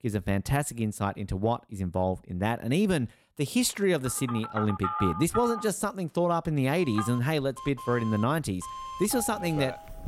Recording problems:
alarms or sirens; loud; from 4.5 s on; 8 dB below the speech

